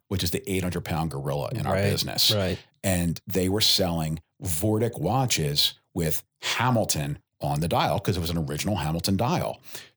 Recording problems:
none

